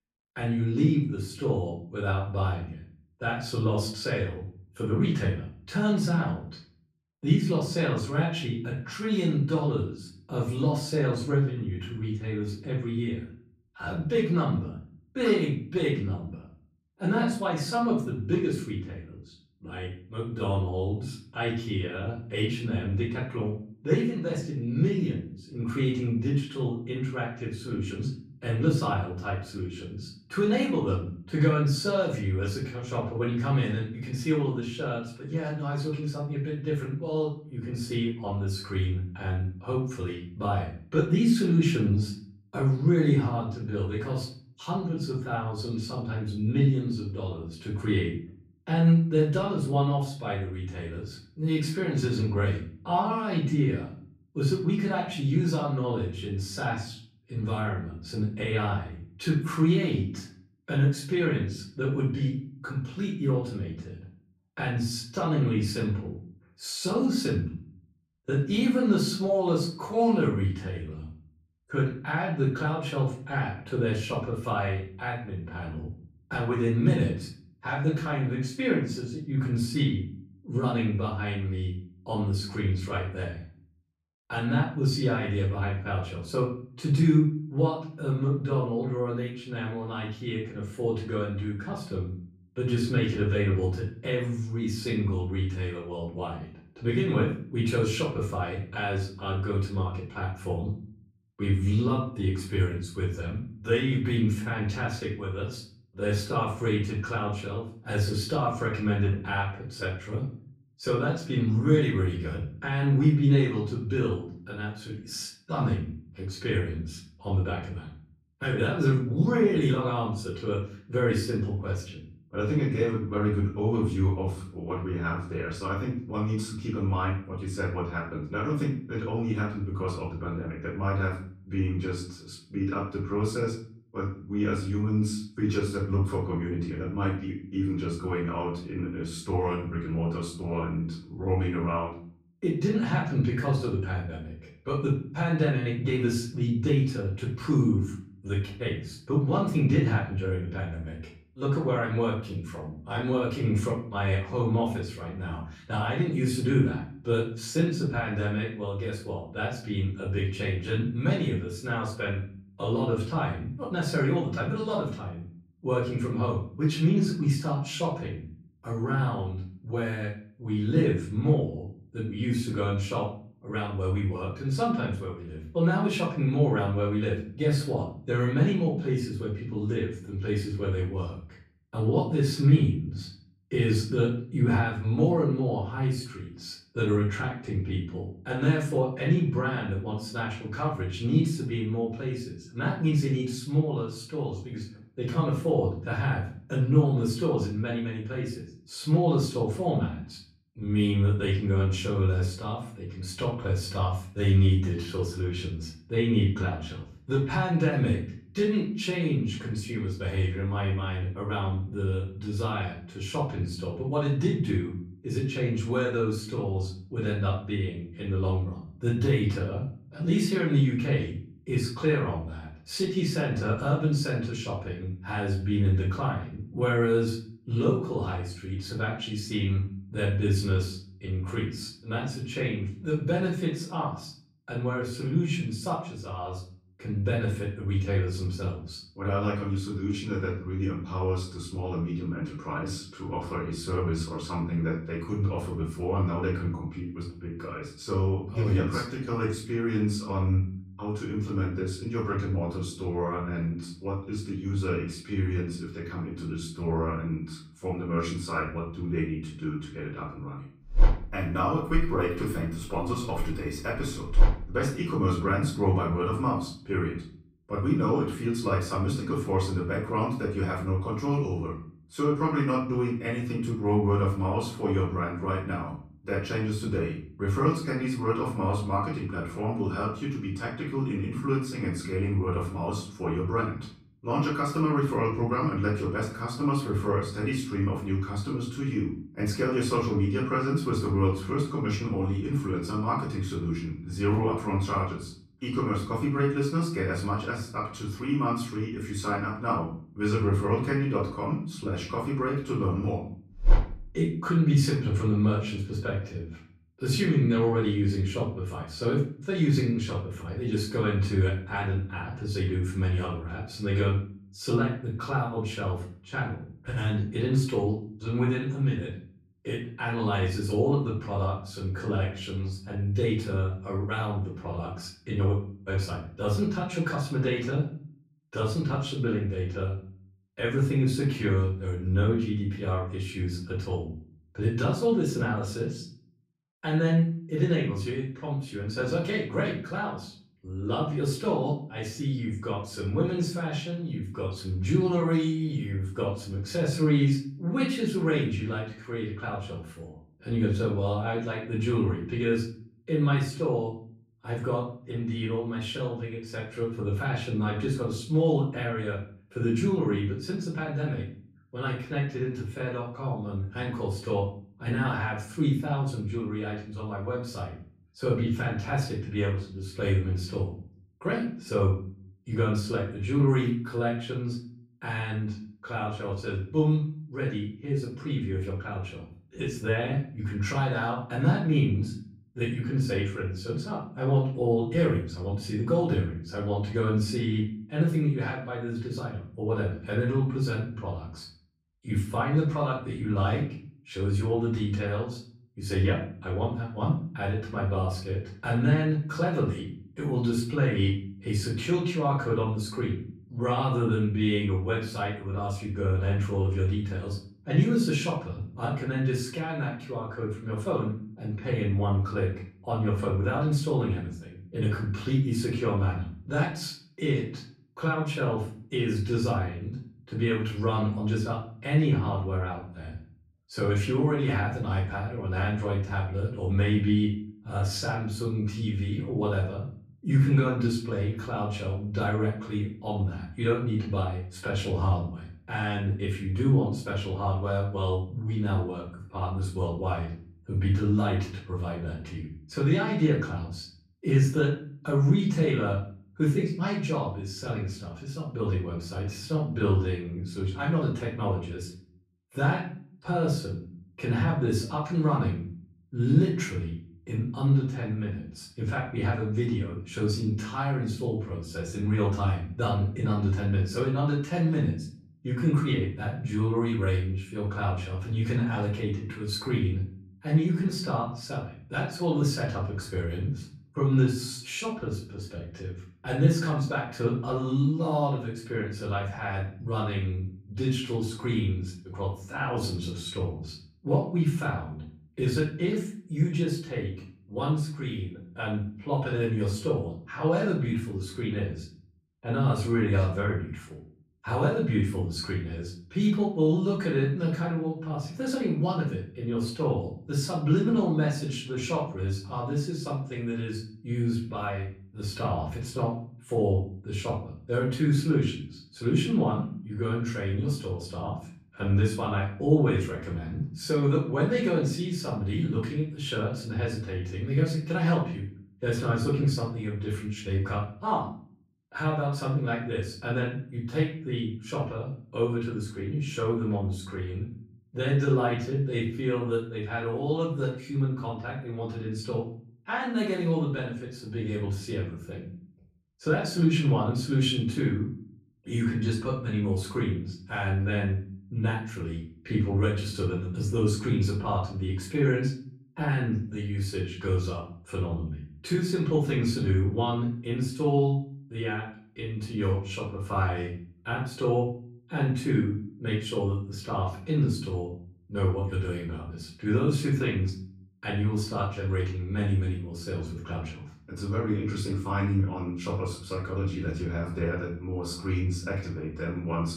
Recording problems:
off-mic speech; far
room echo; noticeable; dies away in 0.5 s

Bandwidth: 15.5 kHz